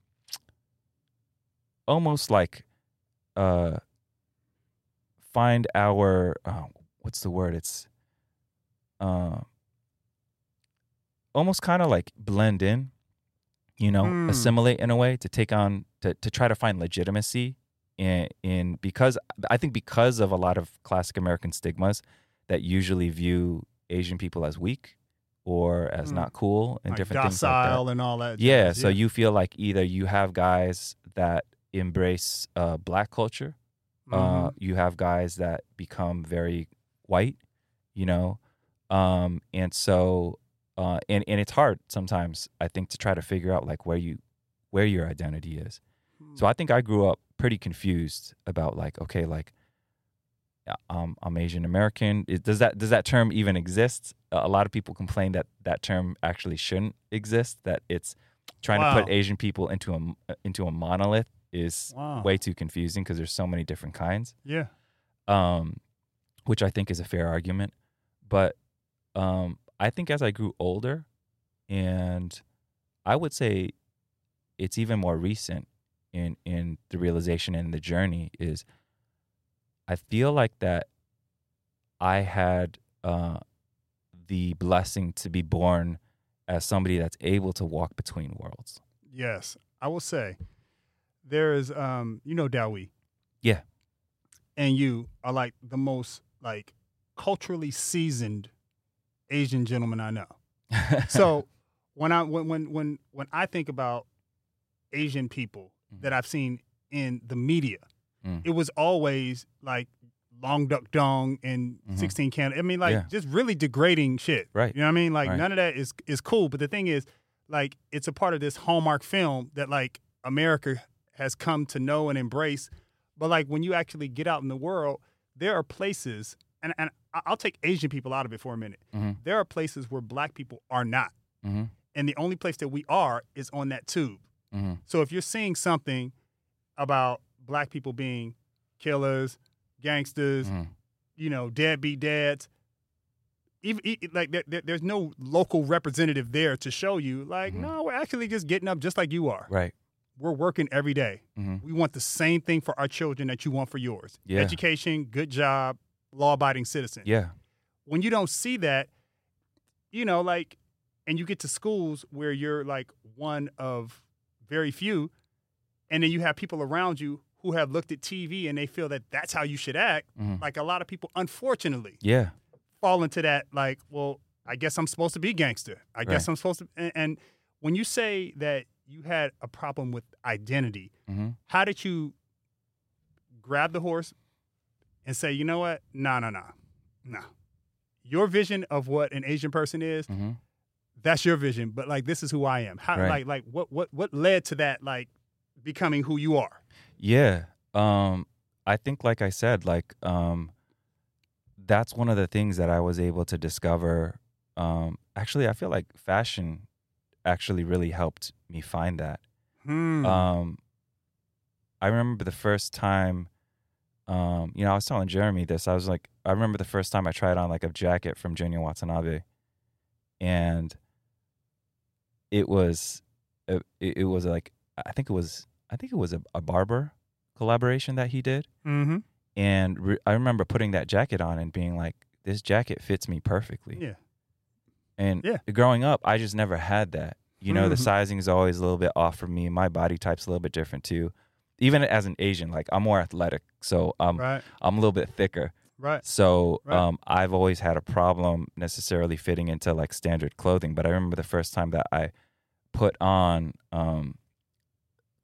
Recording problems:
none

